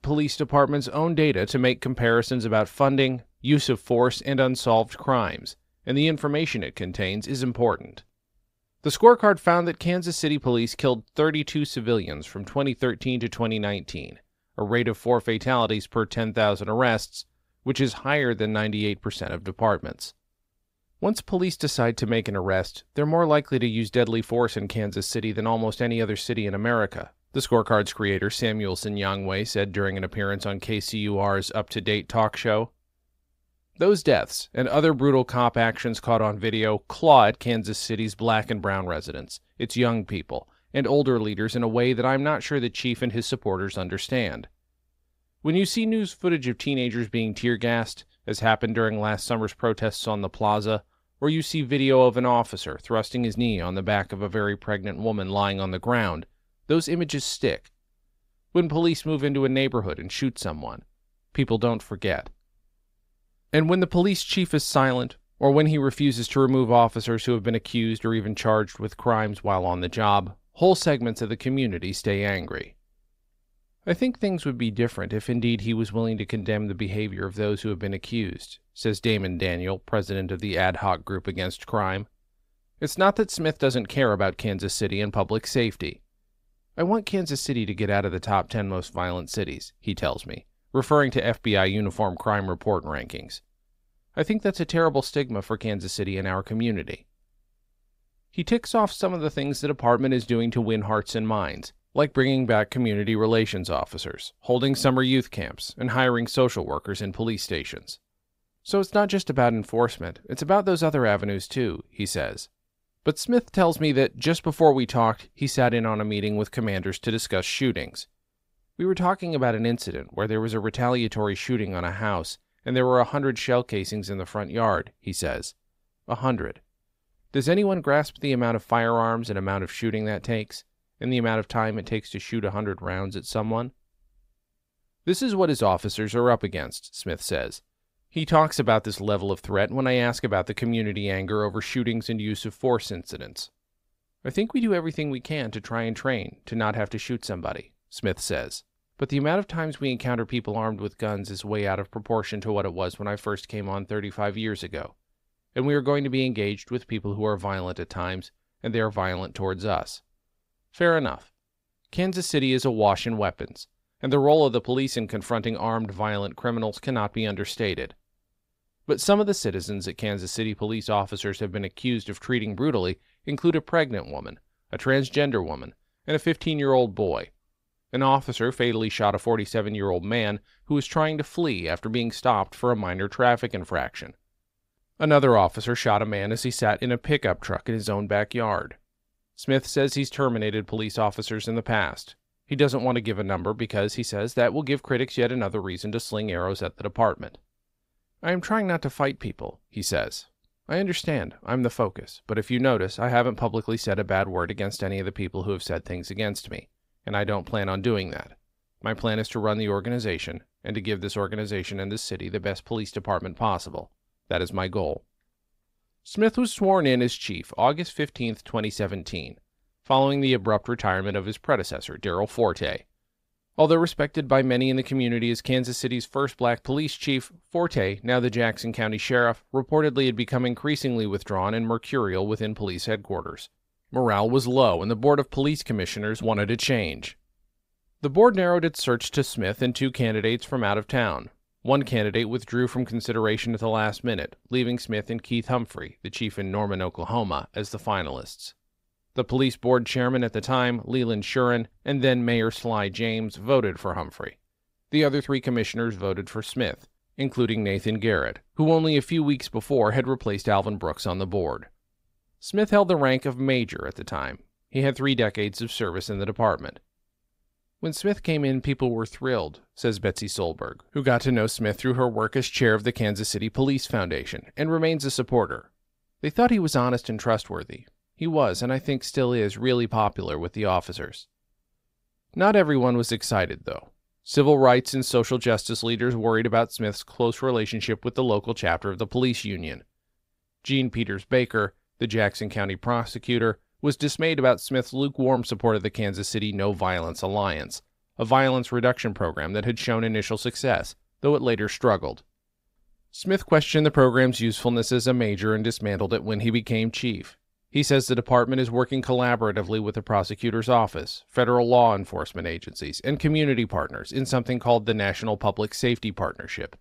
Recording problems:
none

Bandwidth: 15.5 kHz